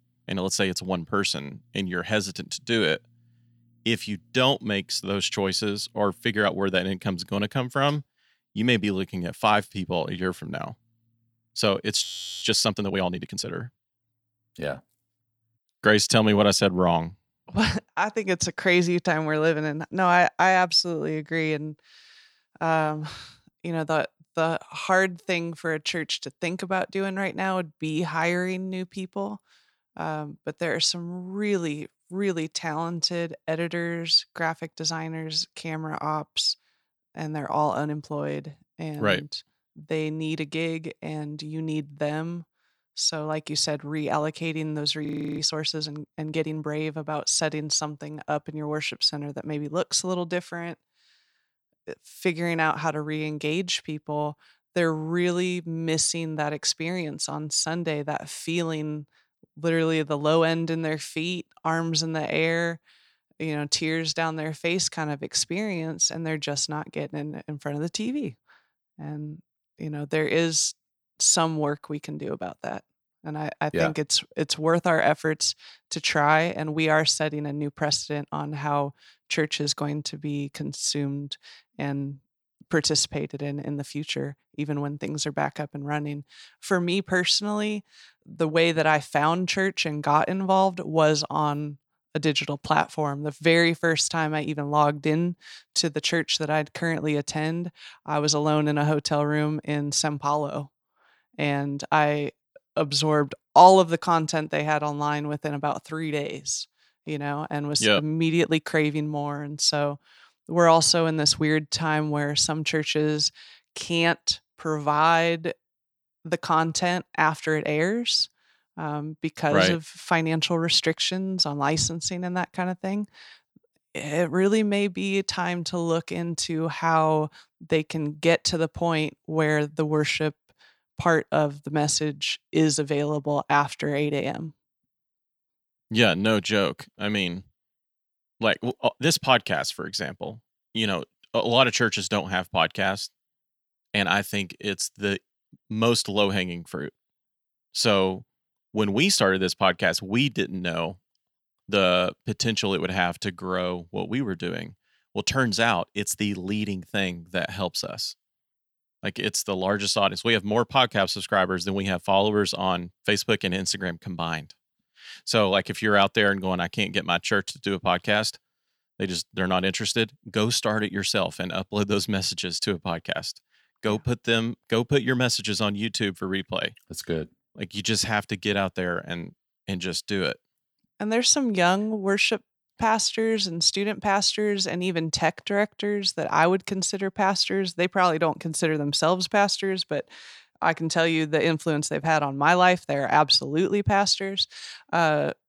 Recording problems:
audio freezing; at 12 s and at 45 s

